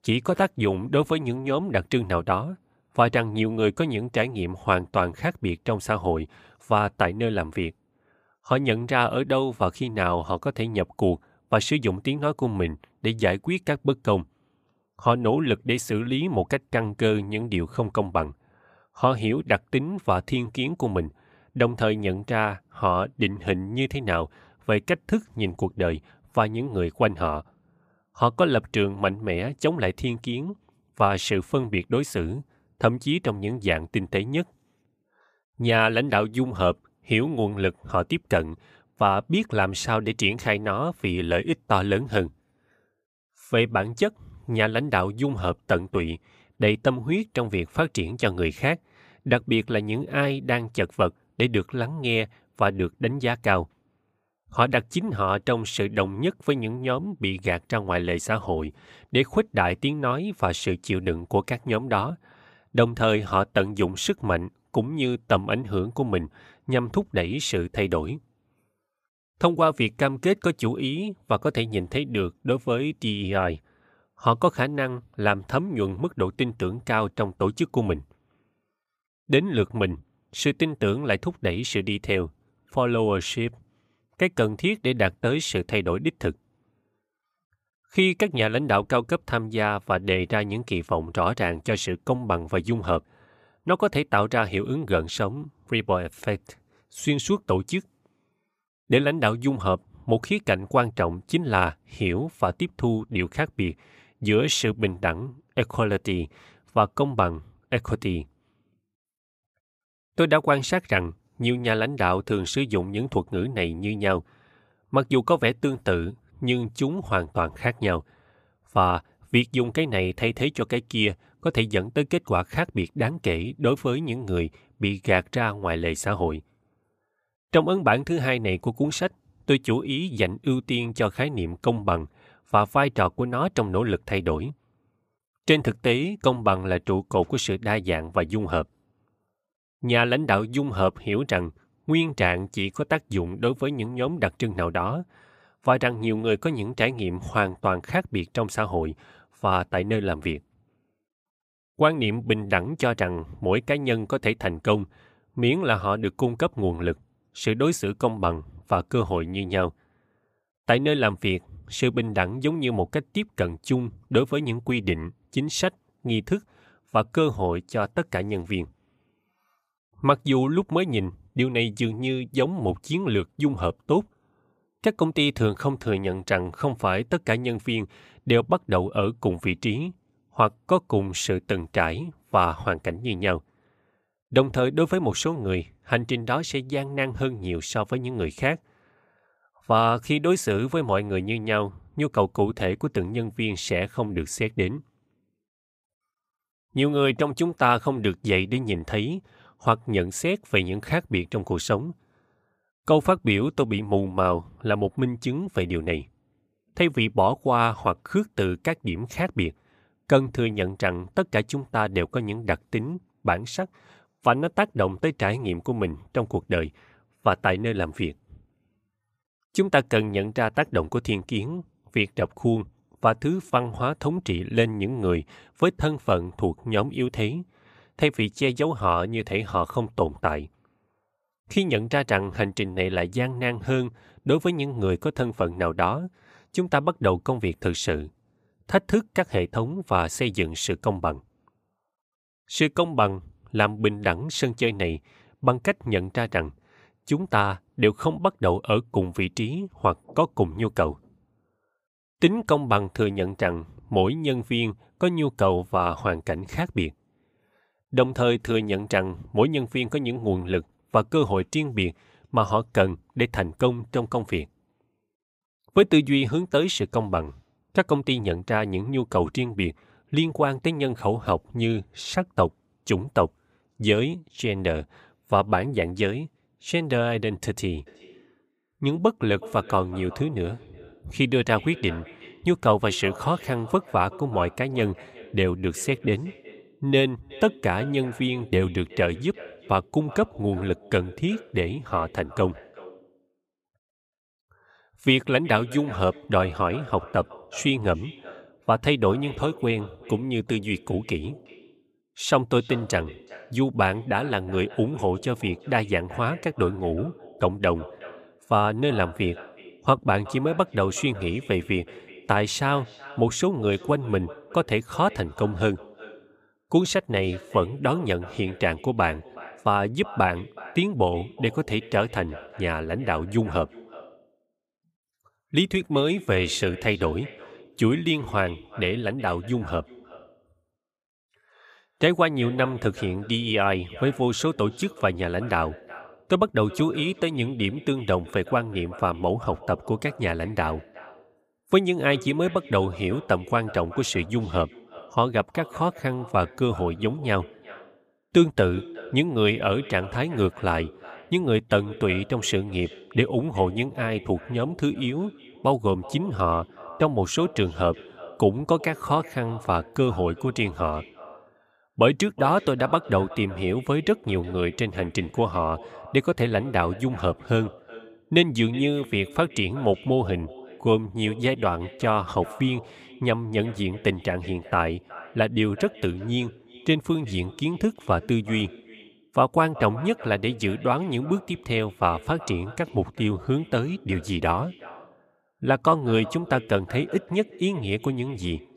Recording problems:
echo of what is said; faint; from 4:38 on; 370 ms later, 20 dB below the speech

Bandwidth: 15 kHz